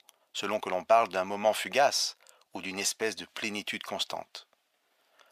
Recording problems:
thin; very; fading below 650 Hz

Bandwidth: 15 kHz